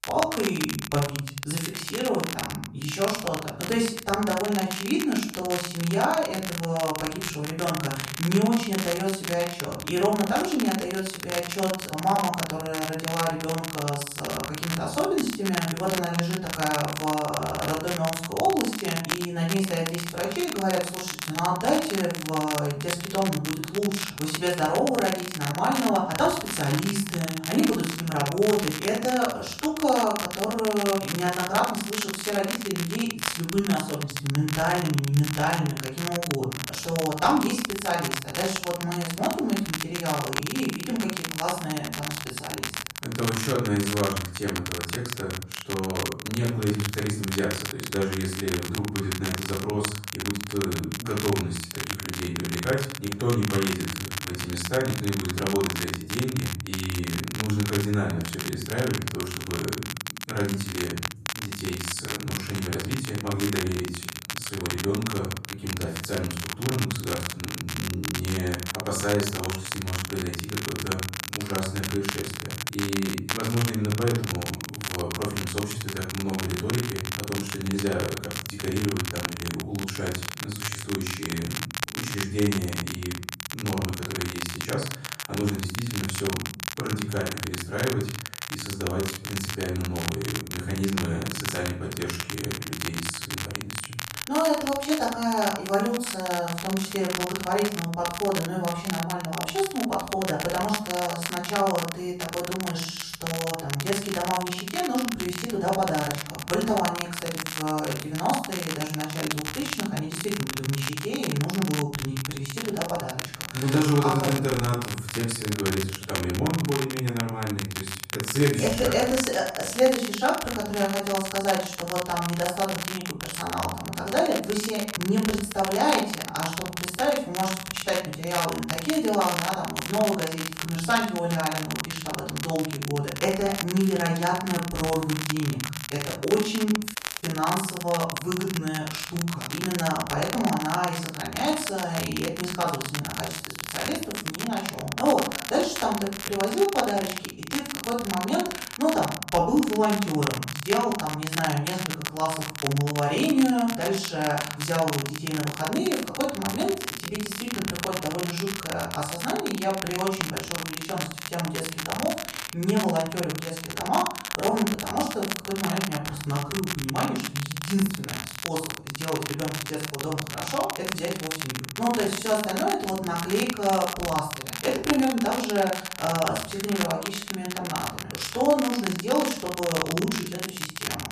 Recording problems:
off-mic speech; far
room echo; noticeable; dies away in 0.5 s
crackle, like an old record; loud; 5 dB below the speech
audio cutting out; at 2:17

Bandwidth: 14.5 kHz